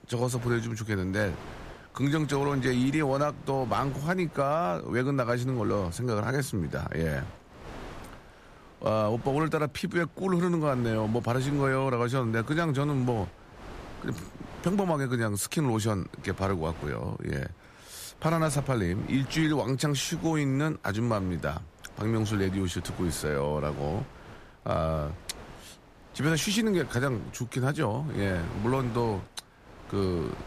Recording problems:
wind noise on the microphone; occasional gusts; 15 dB below the speech

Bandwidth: 14.5 kHz